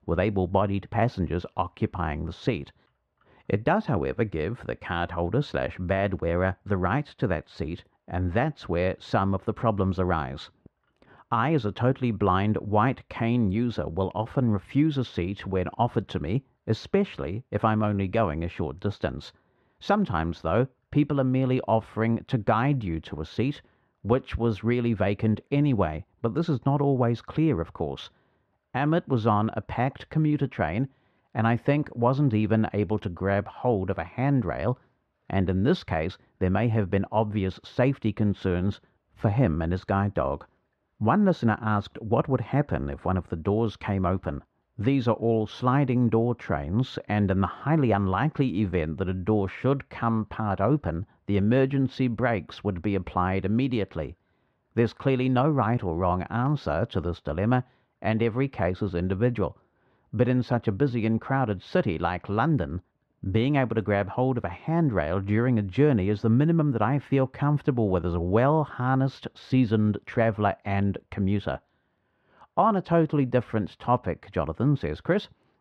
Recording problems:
muffled; very; fading above 3 kHz

